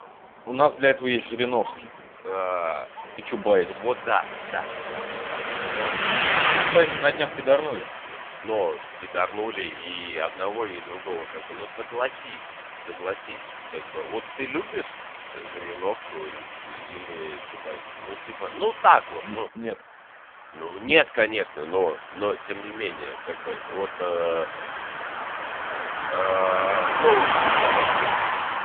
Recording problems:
phone-call audio; poor line; nothing above 3.5 kHz
traffic noise; loud; throughout; 3 dB below the speech

